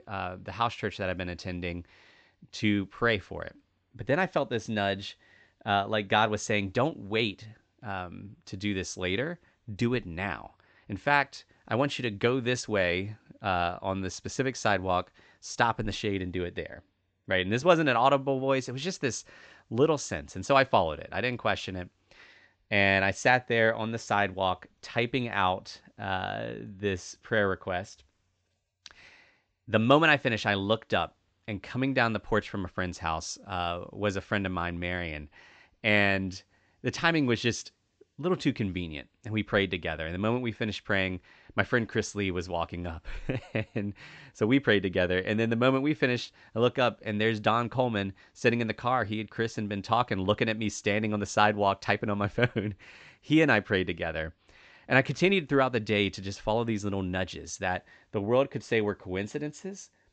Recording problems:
high frequencies cut off; noticeable; nothing above 8 kHz

